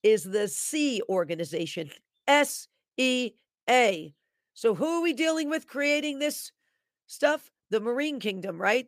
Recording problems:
none

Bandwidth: 15 kHz